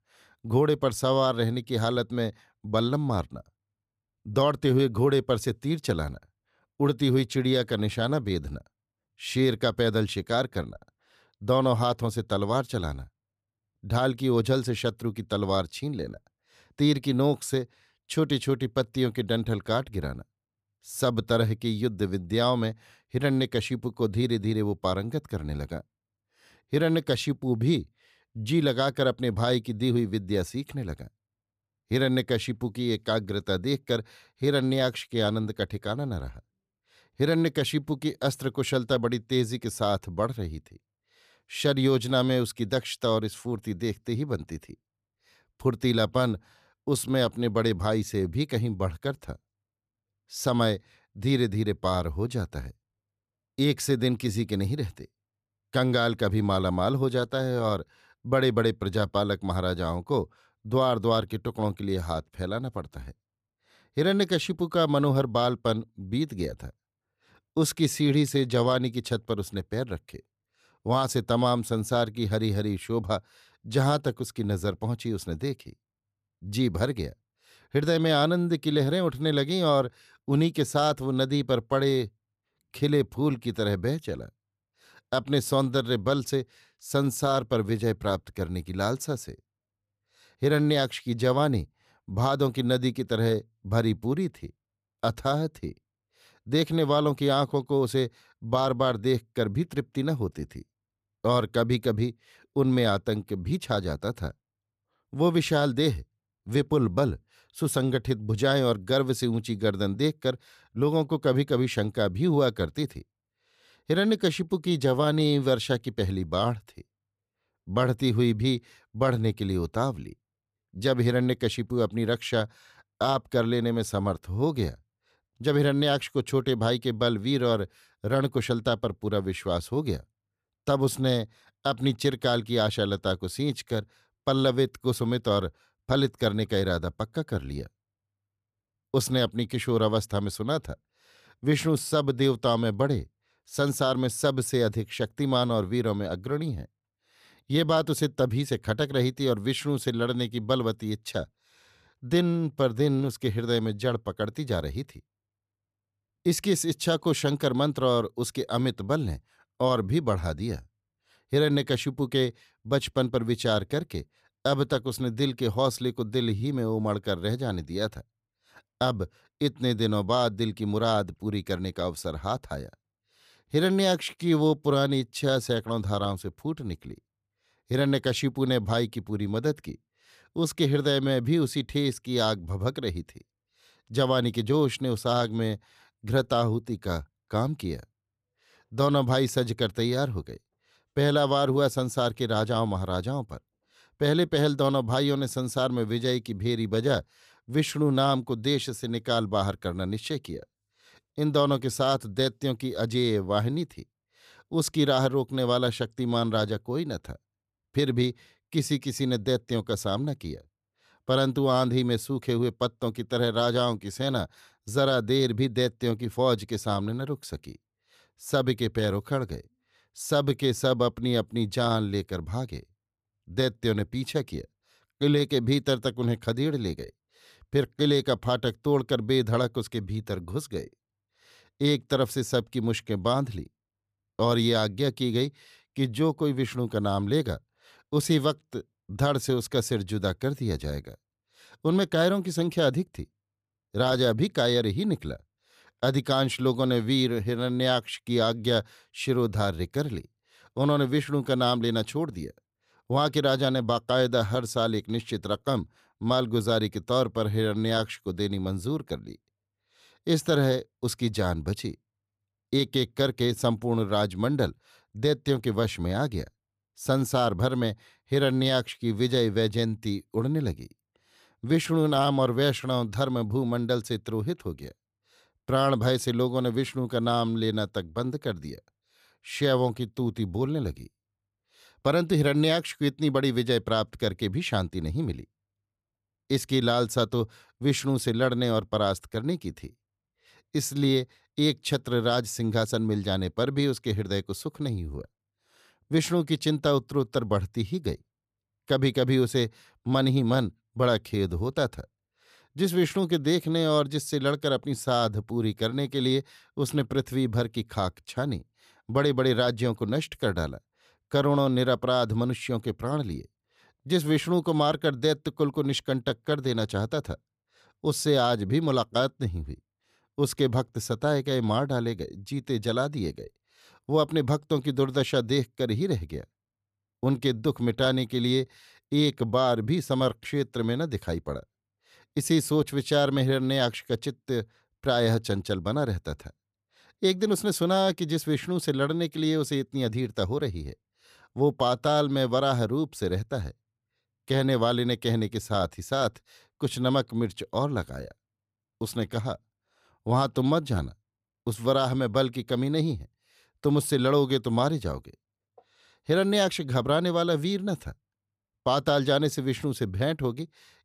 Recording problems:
none

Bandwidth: 14.5 kHz